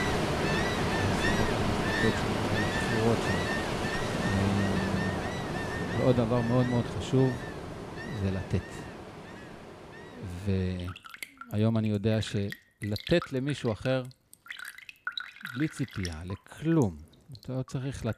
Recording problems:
rain or running water; loud; throughout; 1 dB below the speech

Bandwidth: 14.5 kHz